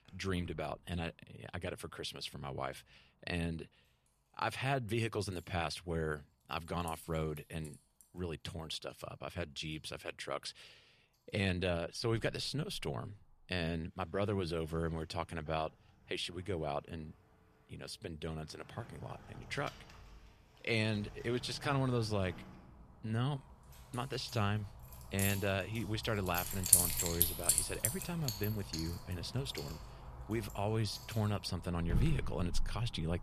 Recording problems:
household noises; very loud; throughout; 2 dB above the speech

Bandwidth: 14.5 kHz